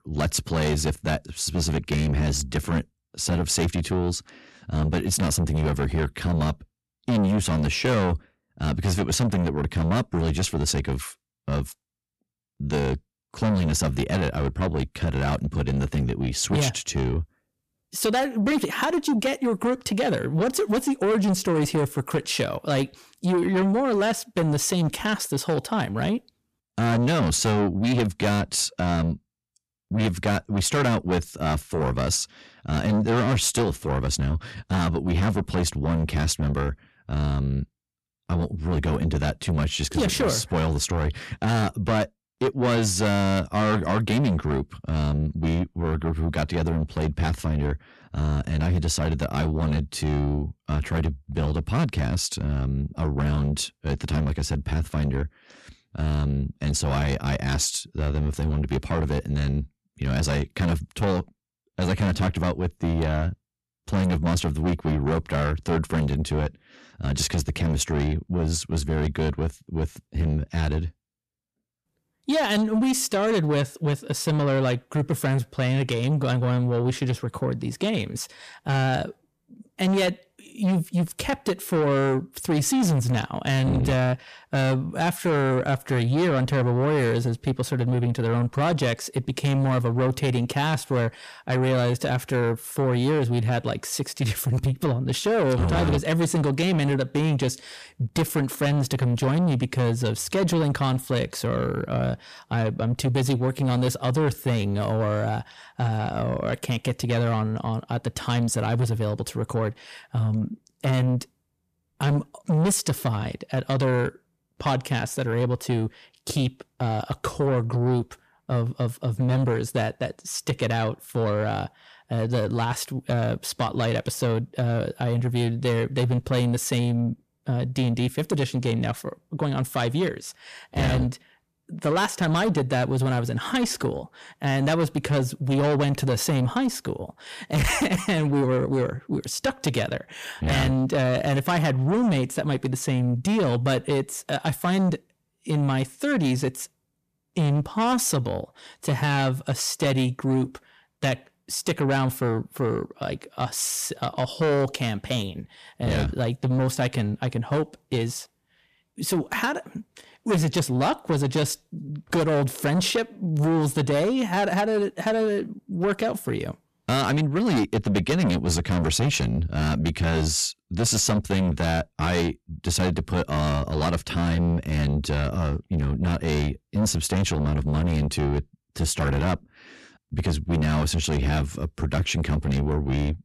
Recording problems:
distortion; heavy; 7 dB below the speech

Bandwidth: 14.5 kHz